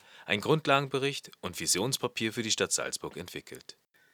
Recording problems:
thin; somewhat; fading below 650 Hz

